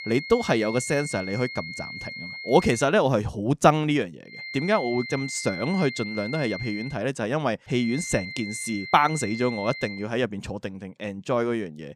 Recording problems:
high-pitched whine; loud; until 3 s, from 4.5 to 7 s and from 8 to 10 s; 2 kHz, 10 dB below the speech

